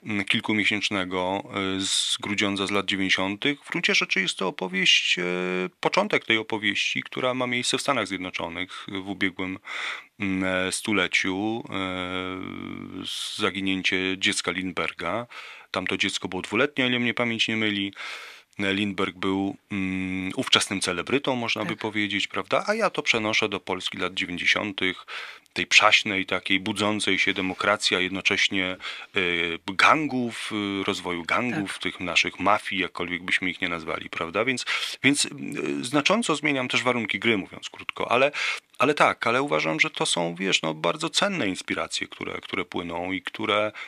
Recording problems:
thin; very slightly; fading below 1 kHz

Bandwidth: 14.5 kHz